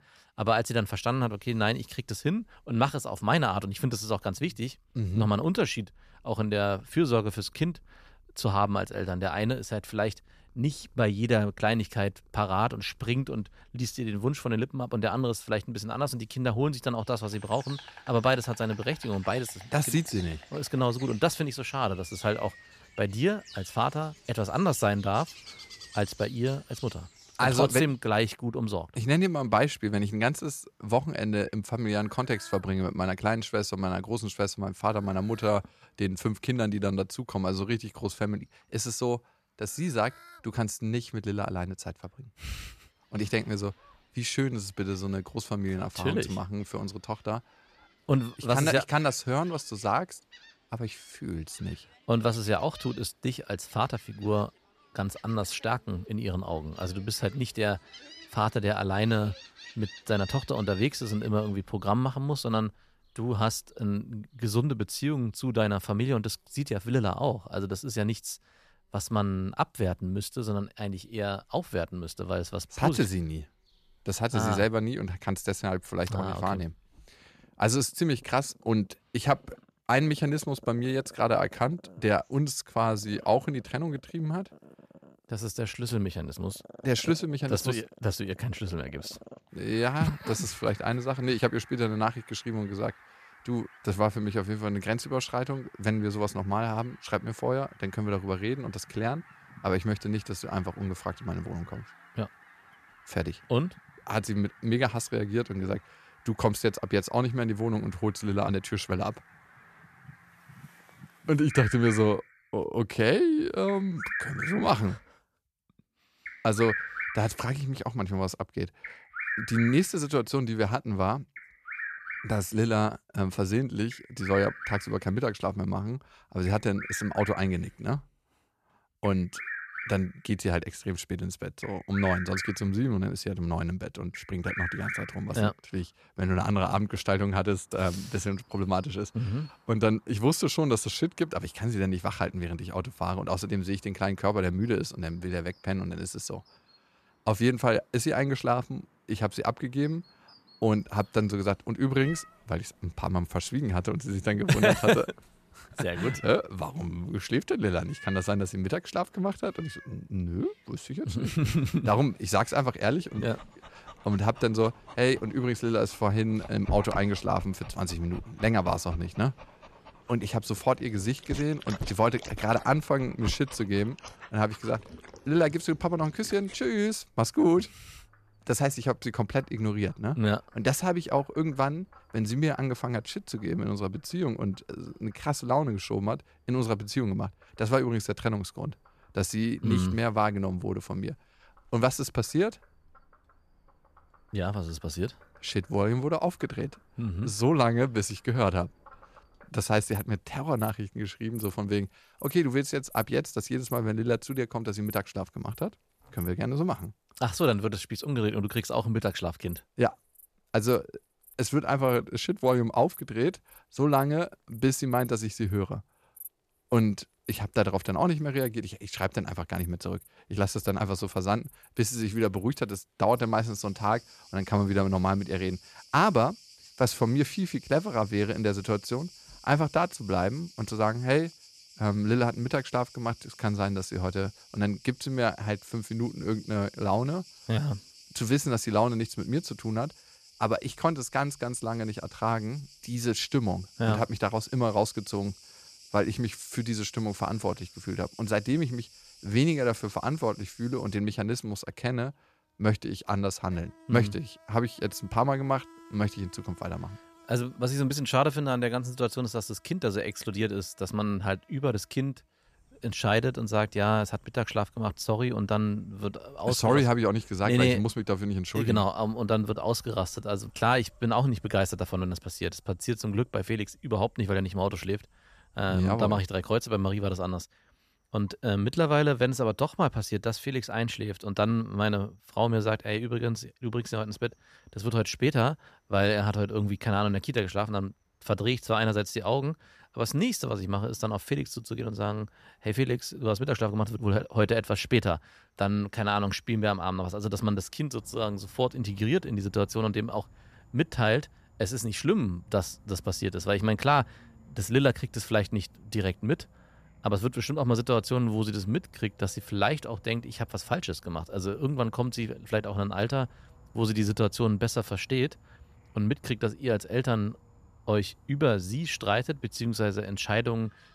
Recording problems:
animal sounds; noticeable; throughout; 15 dB below the speech

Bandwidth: 14.5 kHz